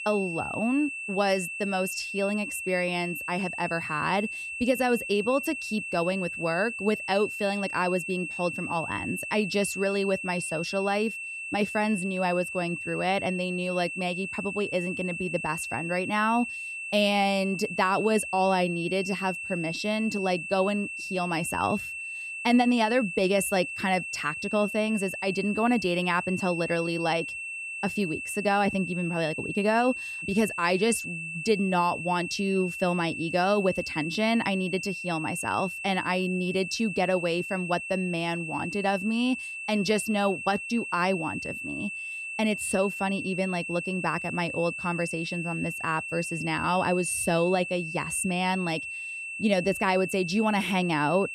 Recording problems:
high-pitched whine; loud; throughout; 2.5 kHz, 6 dB below the speech

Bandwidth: 14 kHz